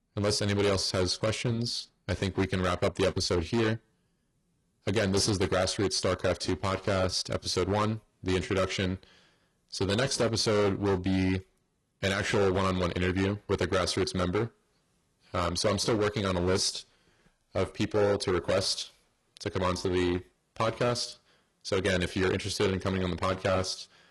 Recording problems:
distortion; heavy; 10% of the sound clipped
garbled, watery; slightly; nothing above 11 kHz

